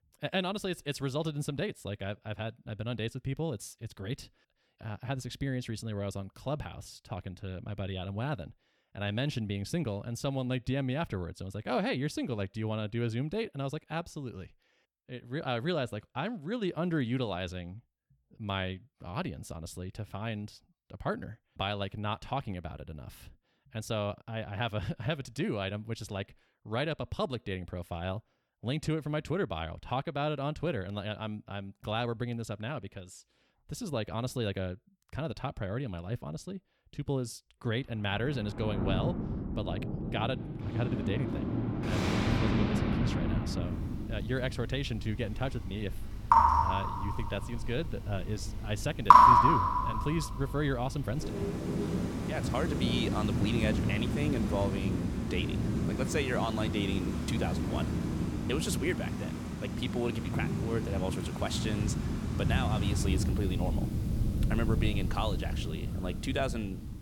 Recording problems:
rain or running water; very loud; from 38 s on; 5 dB above the speech

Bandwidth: 17.5 kHz